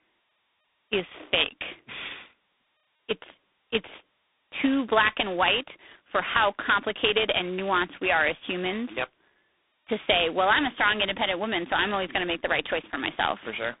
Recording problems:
phone-call audio; poor line; nothing above 3.5 kHz

